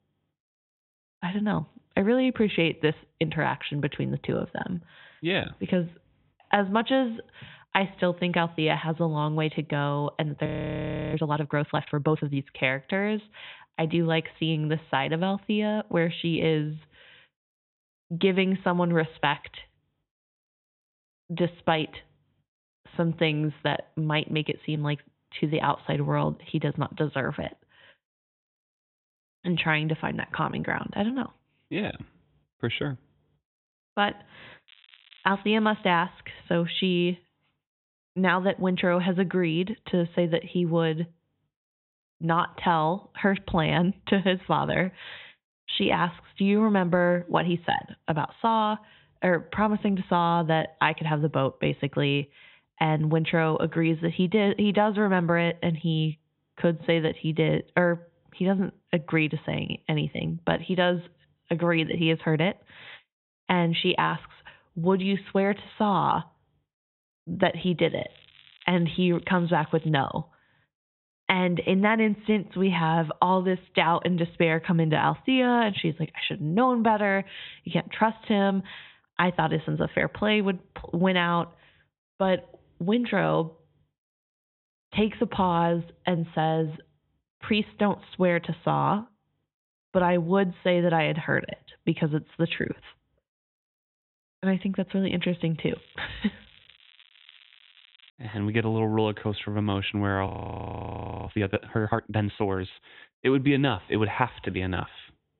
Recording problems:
high frequencies cut off; severe; nothing above 4 kHz
crackling; faint; from 35 to 36 s, from 1:08 to 1:10 and from 1:36 to 1:38; 25 dB below the speech
audio freezing; at 10 s for 0.5 s and at 1:40 for 1 s

